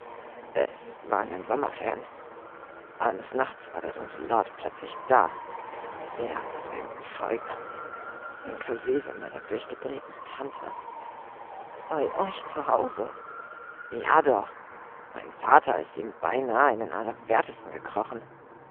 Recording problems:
phone-call audio; poor line
traffic noise; noticeable; throughout; 15 dB below the speech

